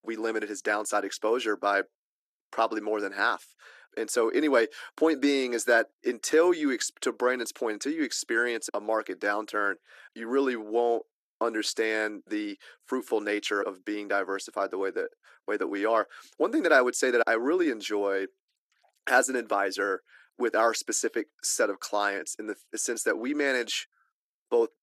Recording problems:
thin; somewhat; fading below 300 Hz

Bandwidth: 13.5 kHz